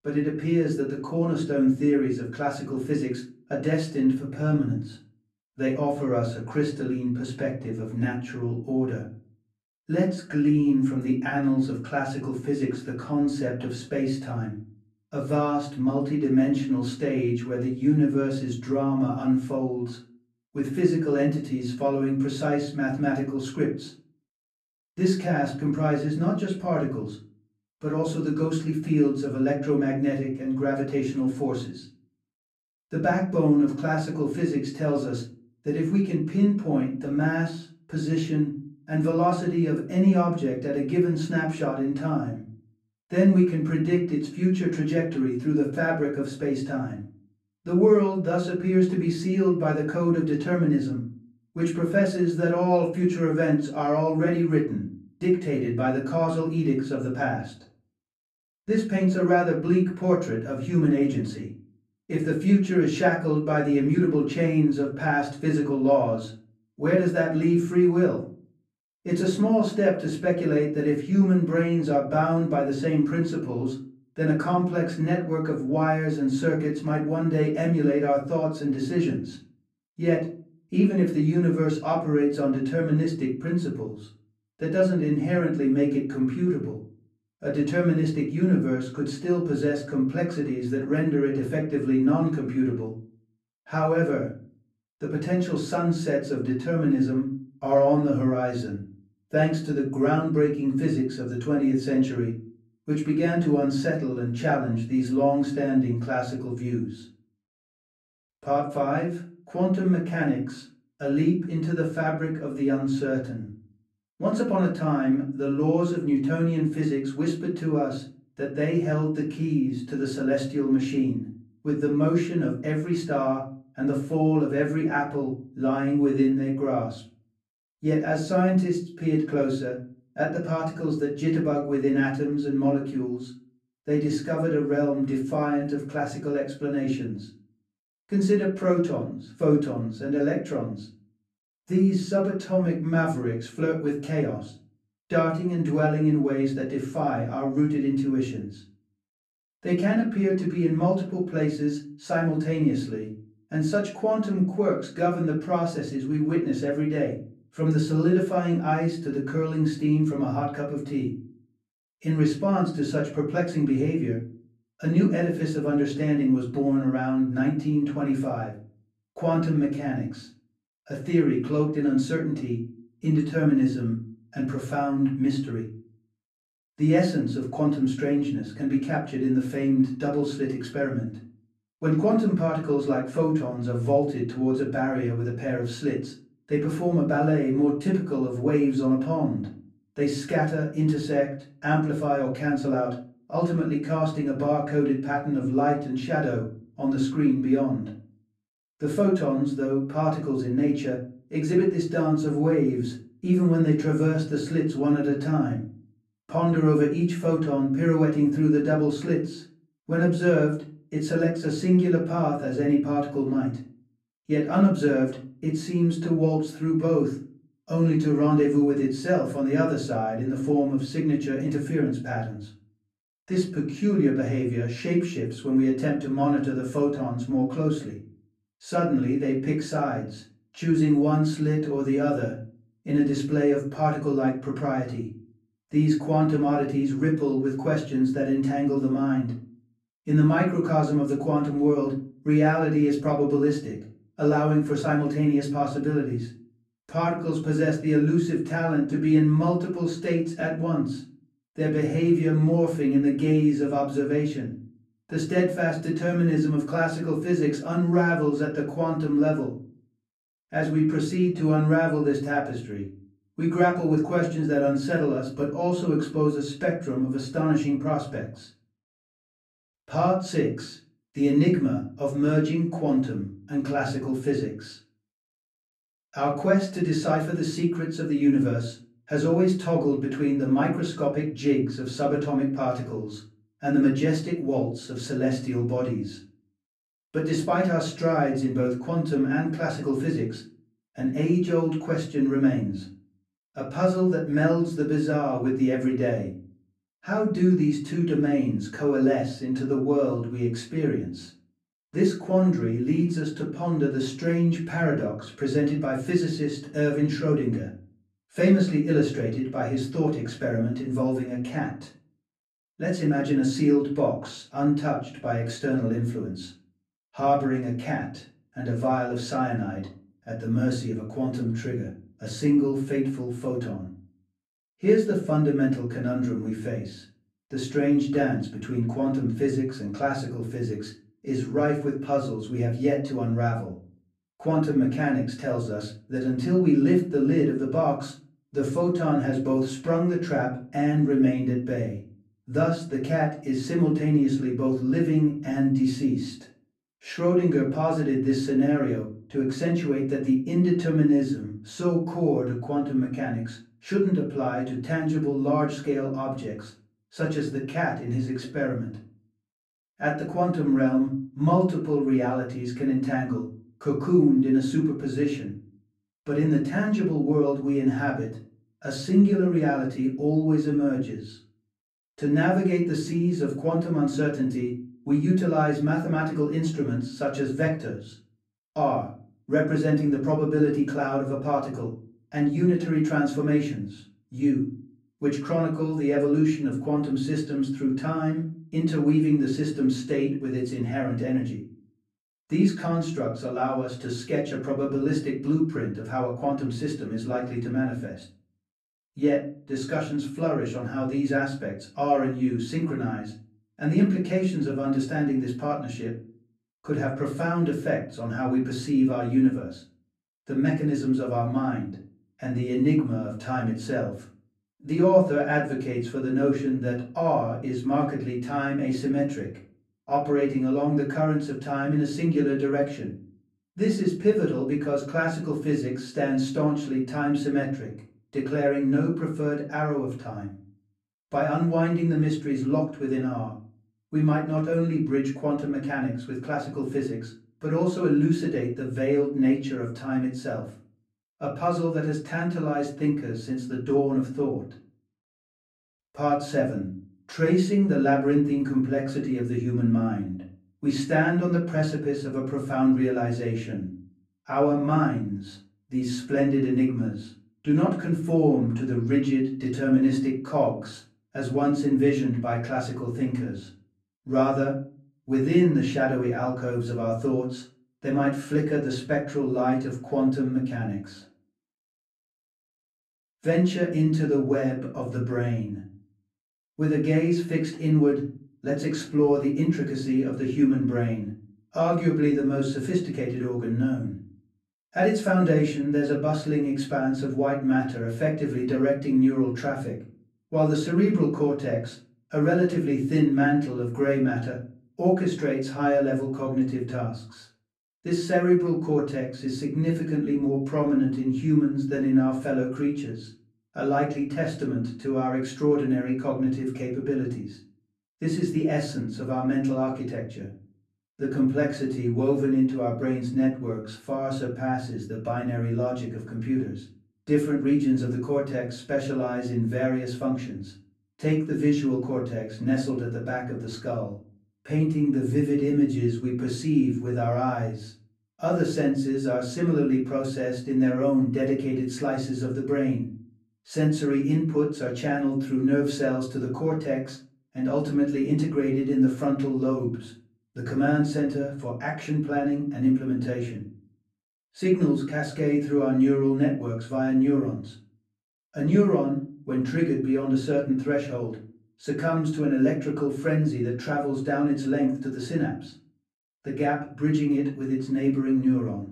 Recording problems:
off-mic speech; far
room echo; slight; dies away in 0.4 s

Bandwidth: 14 kHz